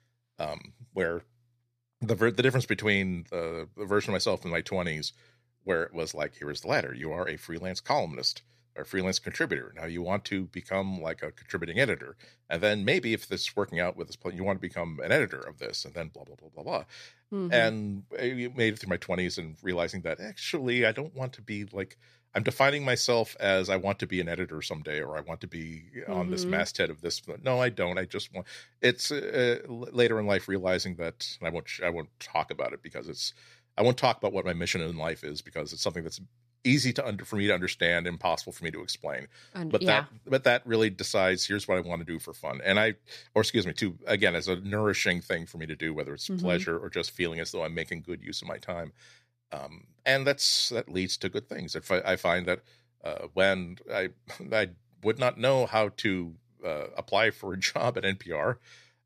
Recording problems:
none

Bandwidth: 14.5 kHz